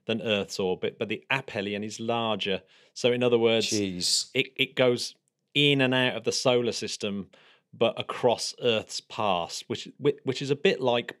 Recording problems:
none

